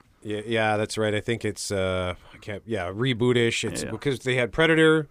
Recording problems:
none

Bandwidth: 15 kHz